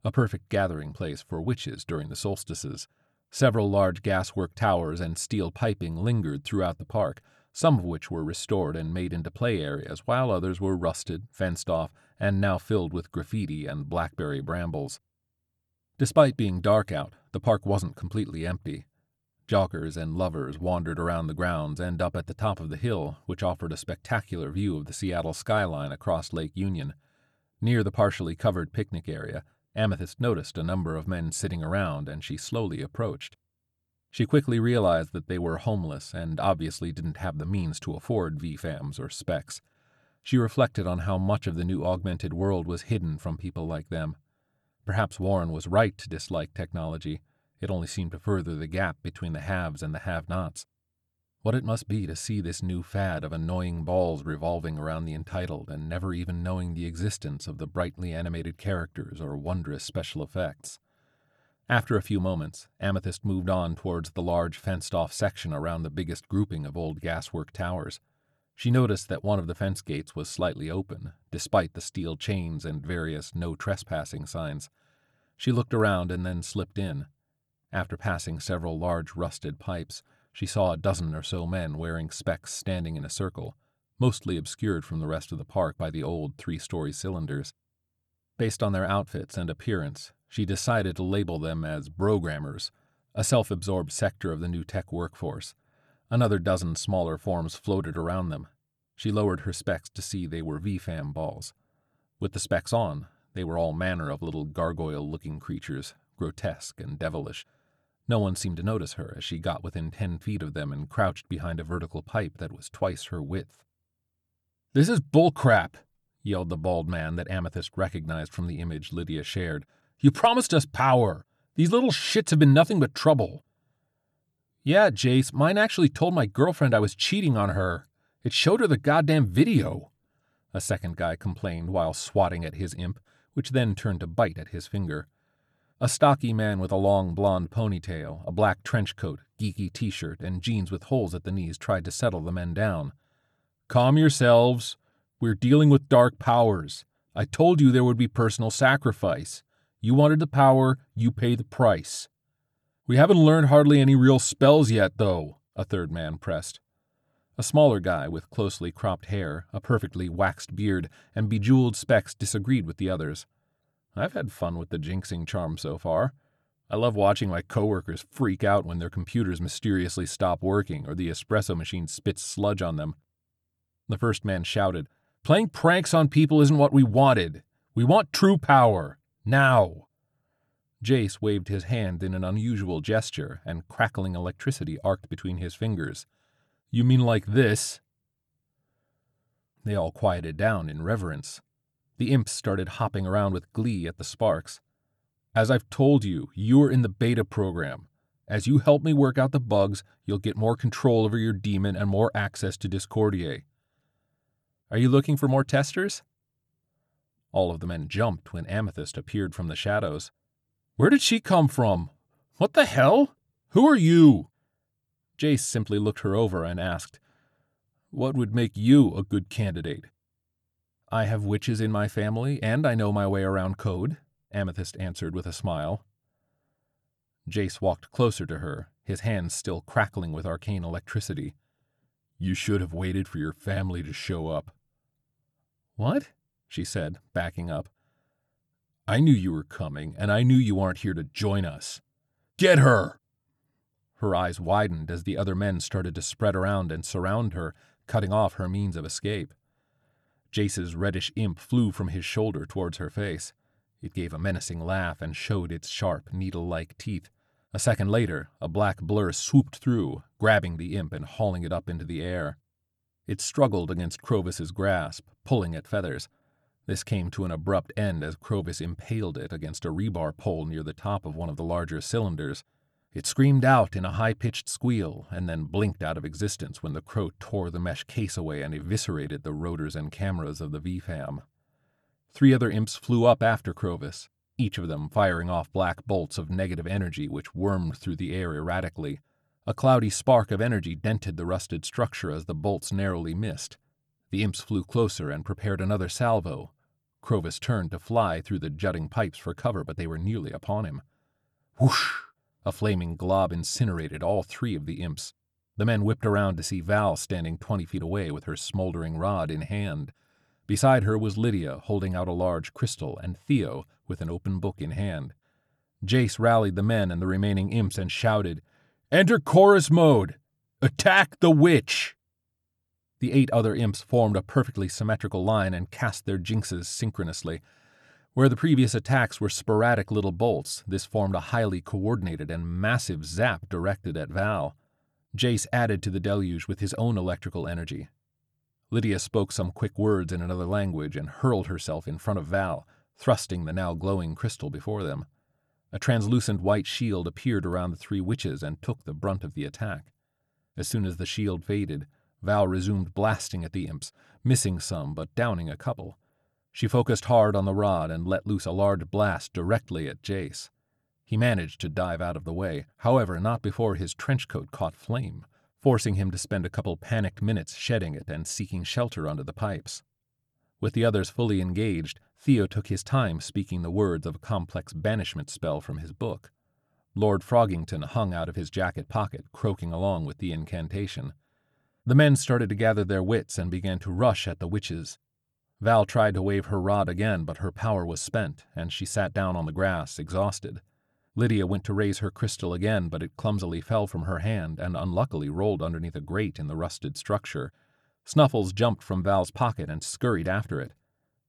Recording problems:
none

